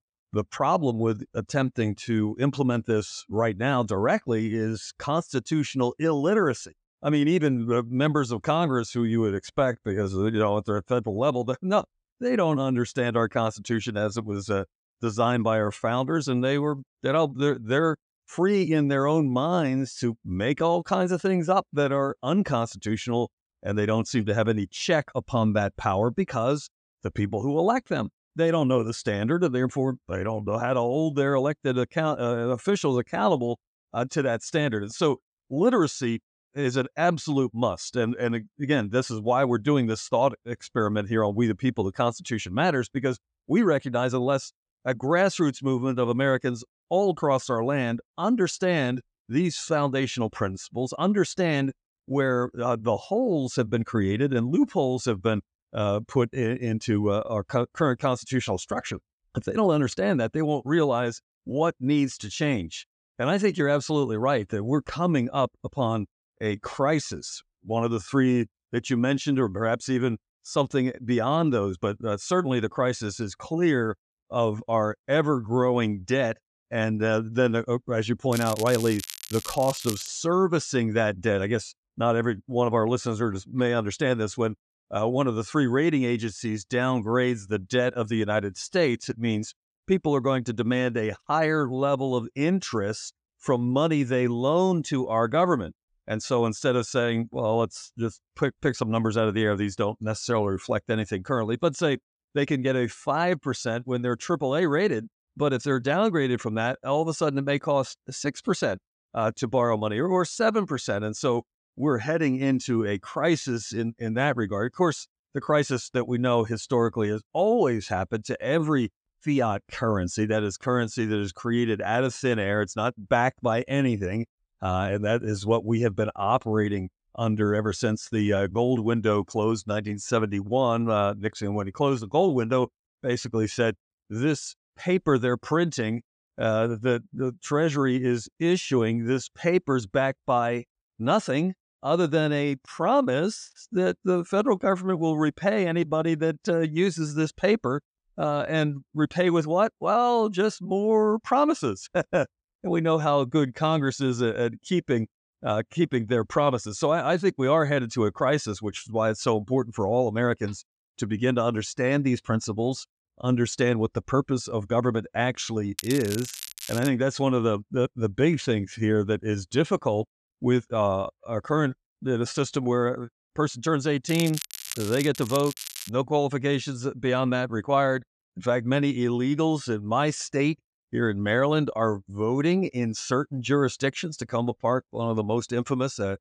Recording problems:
crackling; noticeable; from 1:18 to 1:20, from 2:46 to 2:47 and from 2:54 to 2:56; 10 dB below the speech

